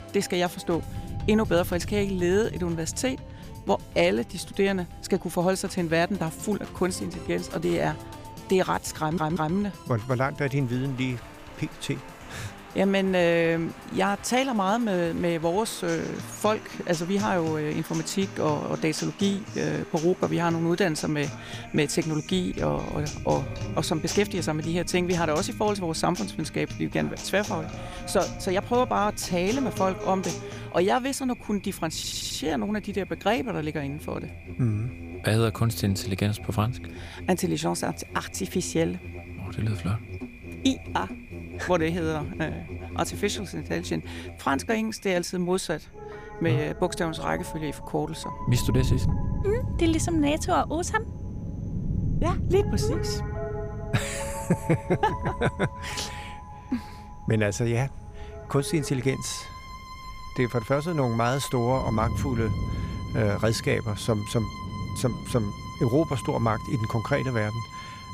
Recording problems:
background music; noticeable; throughout; 15 dB below the speech
rain or running water; noticeable; throughout; 10 dB below the speech
audio stuttering; at 9 s and at 32 s

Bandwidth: 15 kHz